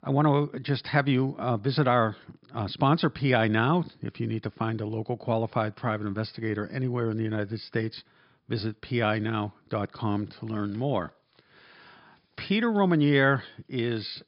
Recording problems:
high frequencies cut off; noticeable; nothing above 5.5 kHz

